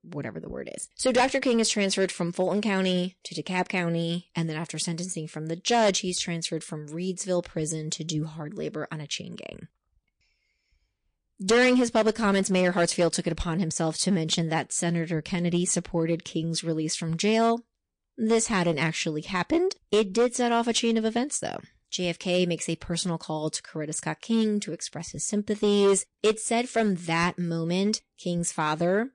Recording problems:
distortion; slight; 3% of the sound clipped
garbled, watery; slightly; nothing above 8.5 kHz

